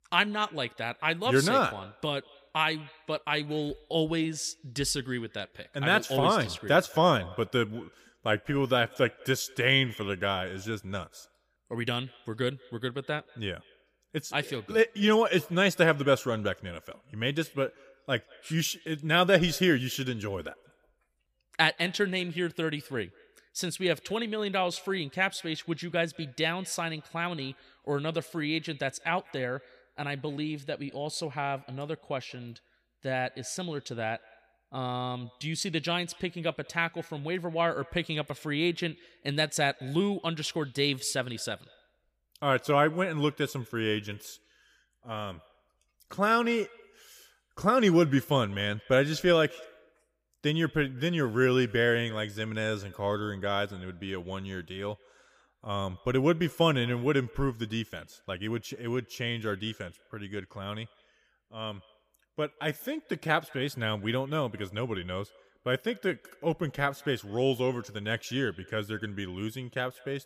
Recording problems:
echo of what is said; faint; throughout; 180 ms later, 25 dB below the speech

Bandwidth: 15 kHz